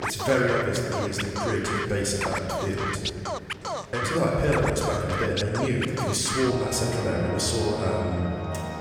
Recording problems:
off-mic speech; far
room echo; noticeable; dies away in 2.2 s
background music; loud; throughout; 6 dB below the speech
chatter from many people; faint; throughout; 20 dB below the speech

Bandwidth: 18 kHz